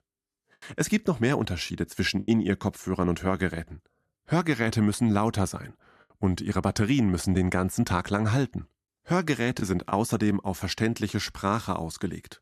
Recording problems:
choppy; occasionally; 1% of the speech affected

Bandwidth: 14 kHz